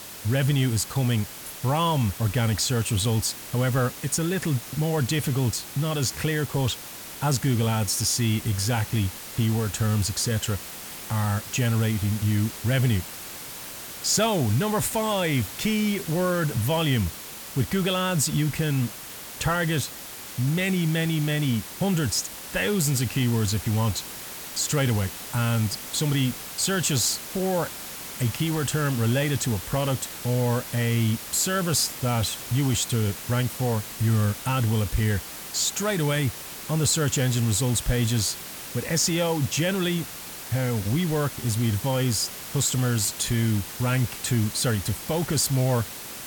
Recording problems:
hiss; noticeable; throughout; 10 dB below the speech

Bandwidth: 18.5 kHz